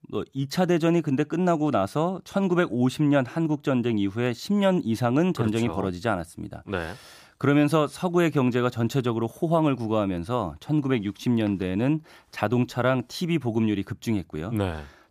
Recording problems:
none

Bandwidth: 15 kHz